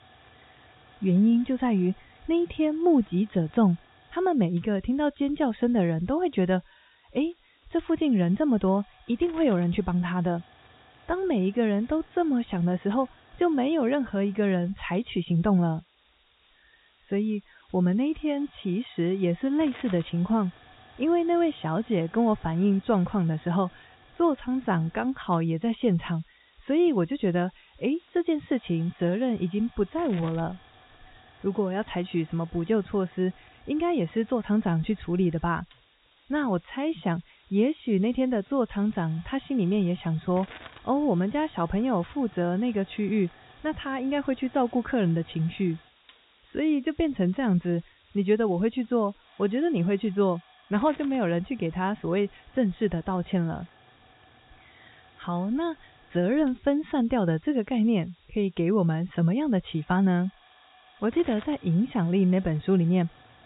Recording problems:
high frequencies cut off; severe; nothing above 4 kHz
hiss; faint; throughout; 25 dB below the speech

